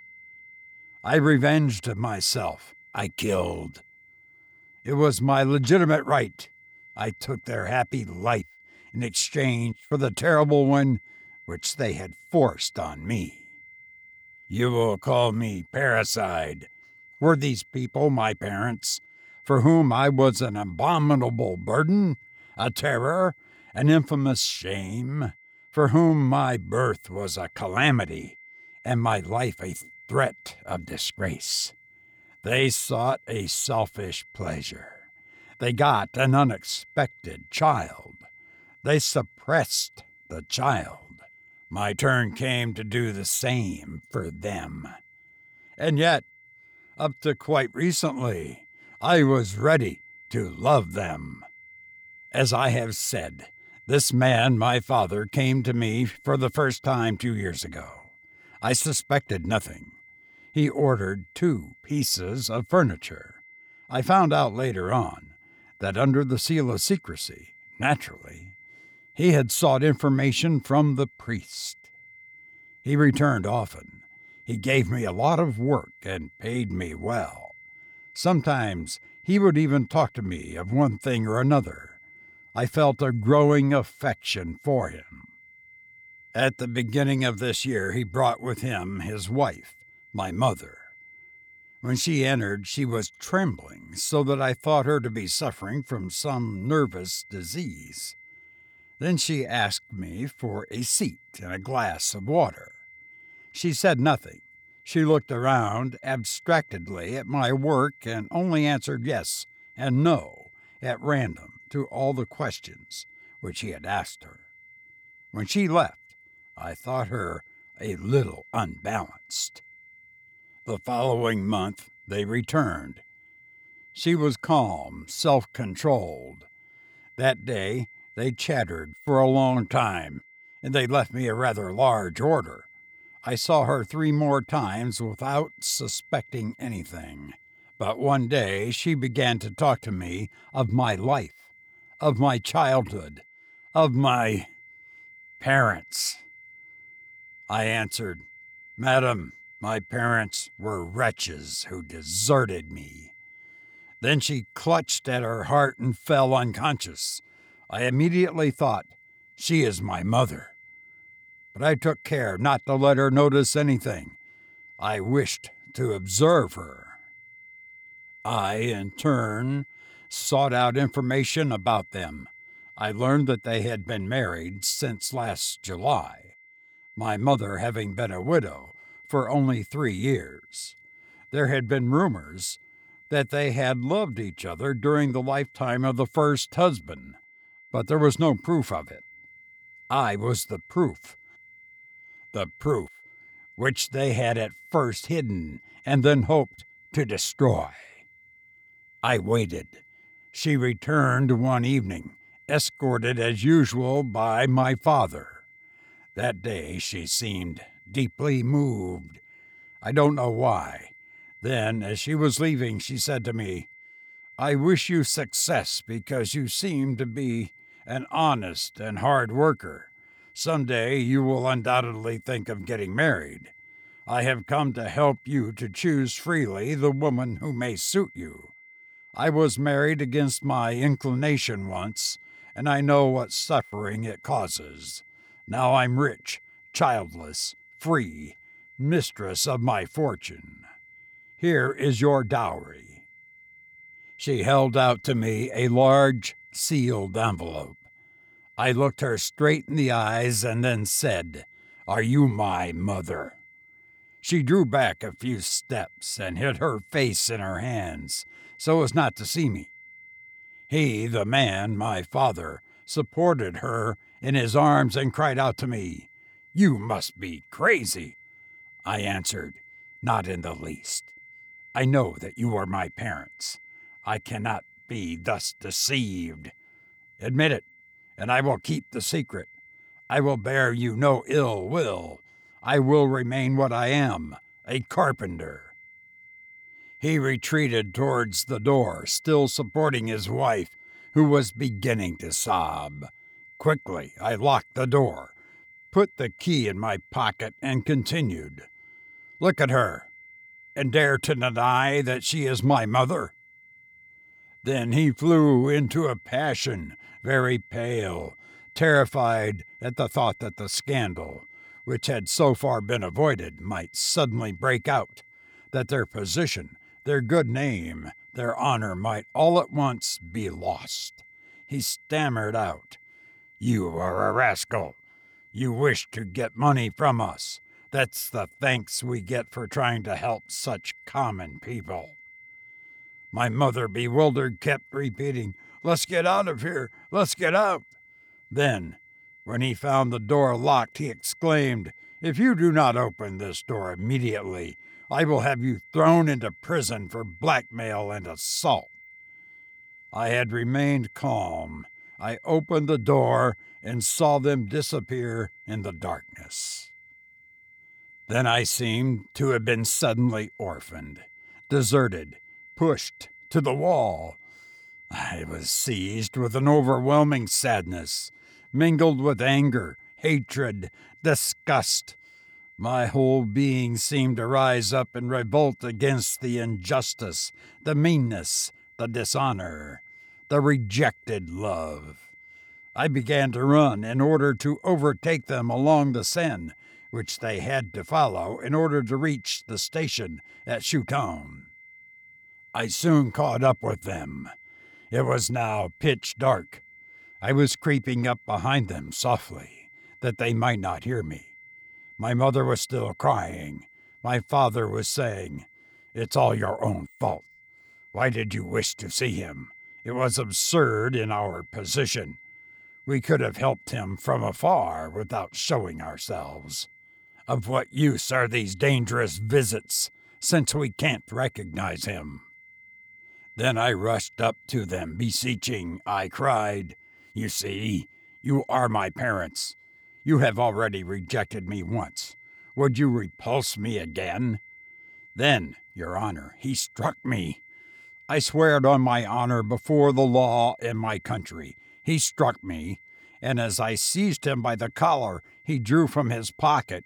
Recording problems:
high-pitched whine; faint; throughout; 2 kHz, 25 dB below the speech

